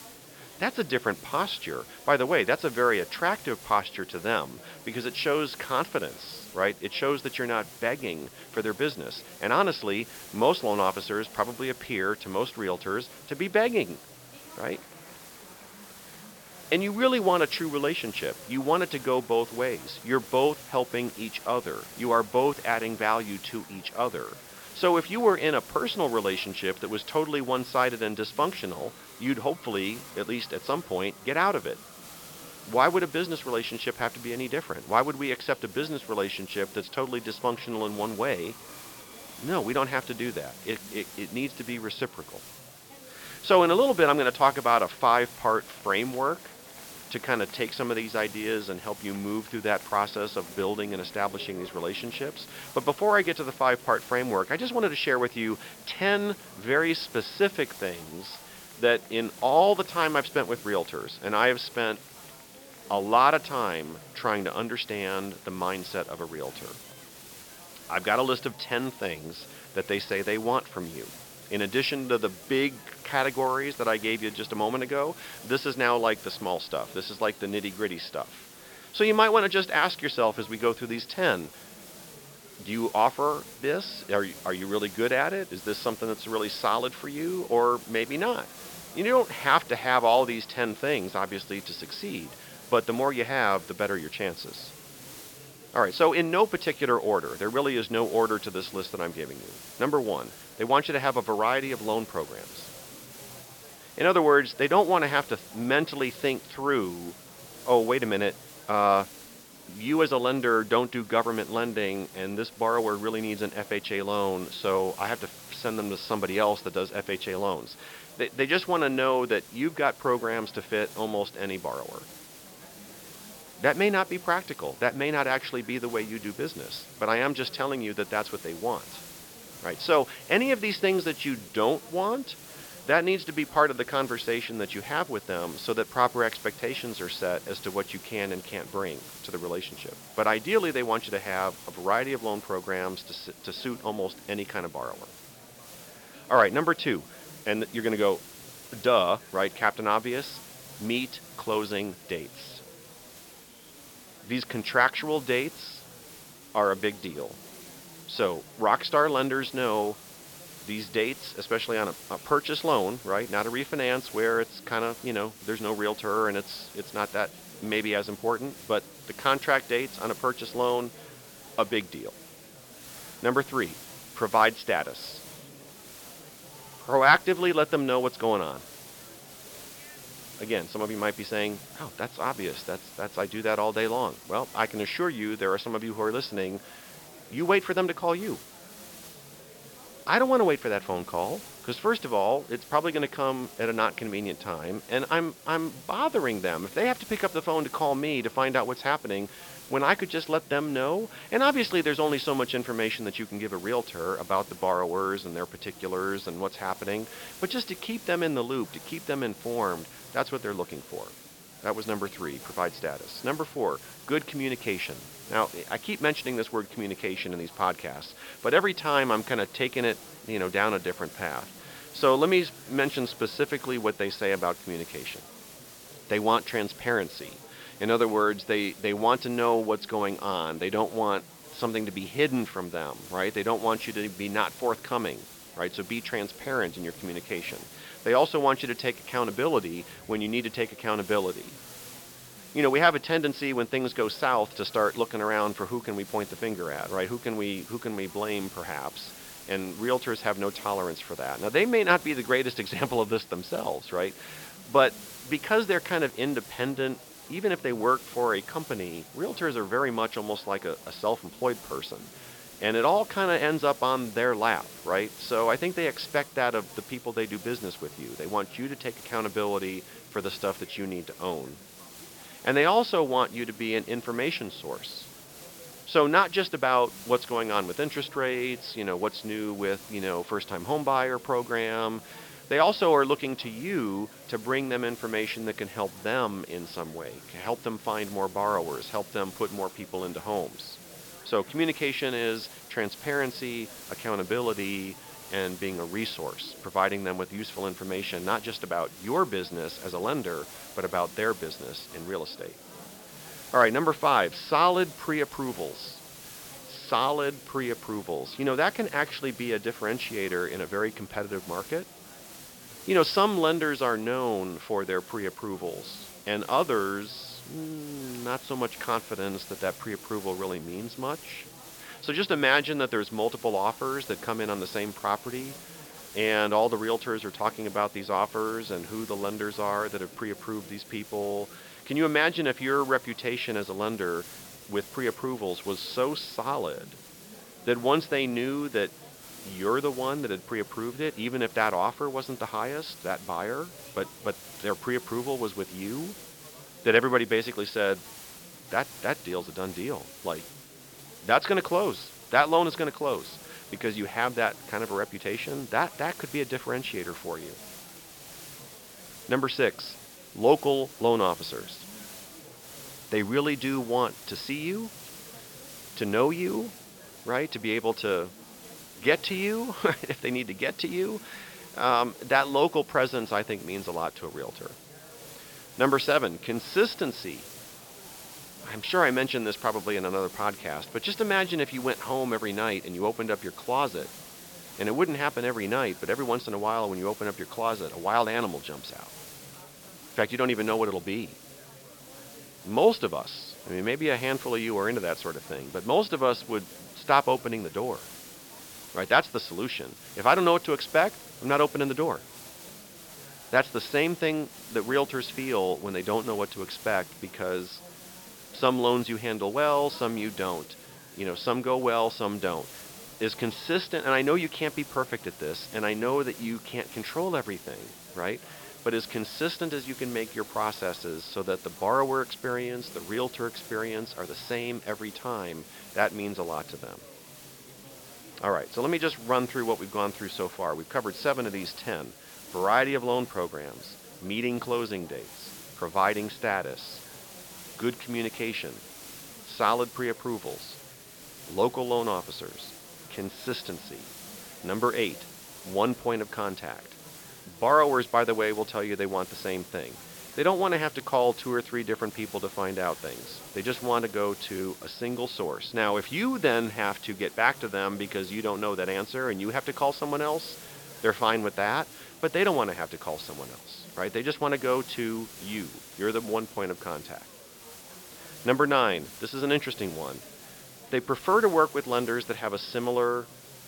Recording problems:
high frequencies cut off; noticeable; nothing above 5.5 kHz
hiss; noticeable; throughout; 15 dB below the speech
murmuring crowd; faint; throughout; 25 dB below the speech

